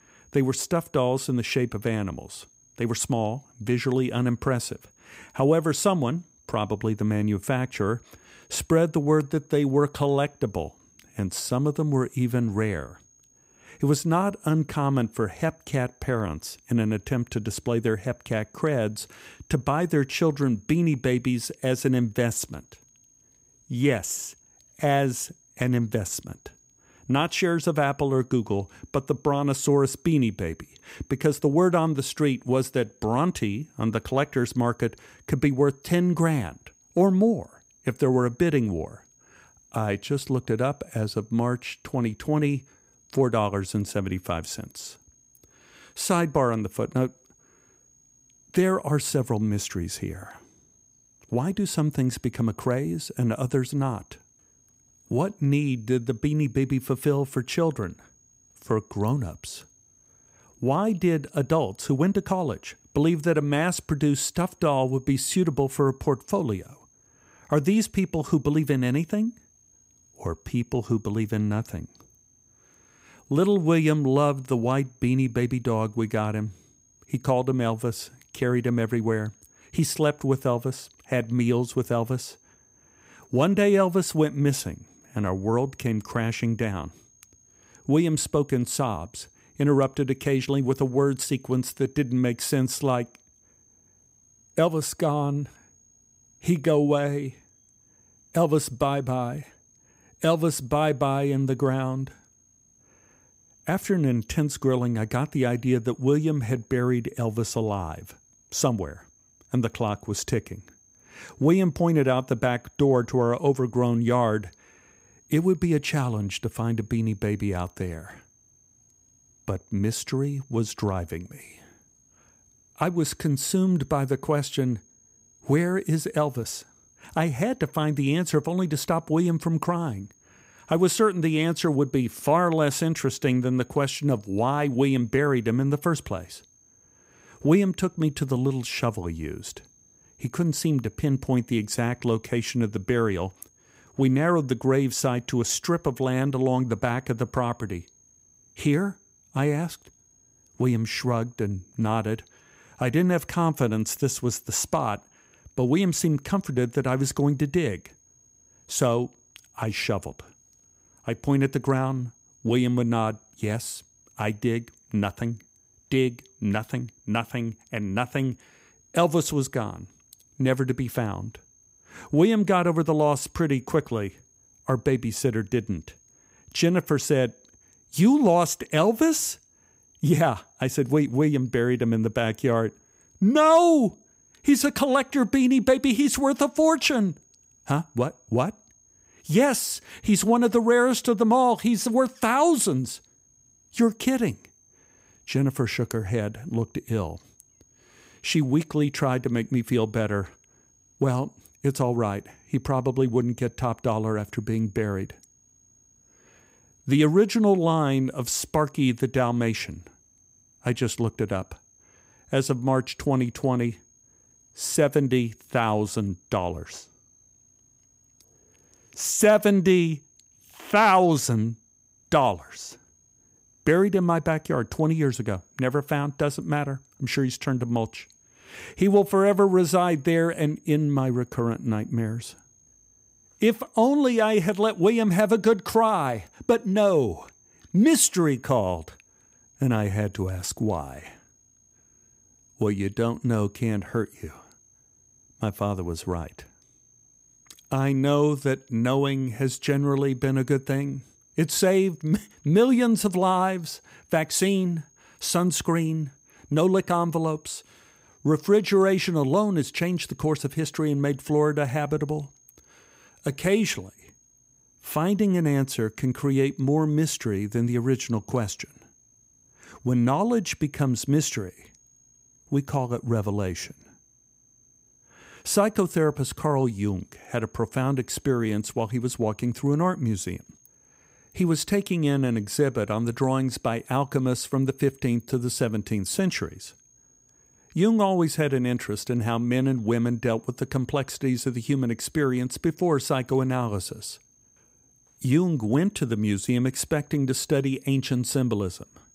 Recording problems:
high-pitched whine; faint; throughout; 6.5 kHz, 35 dB below the speech

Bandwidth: 15.5 kHz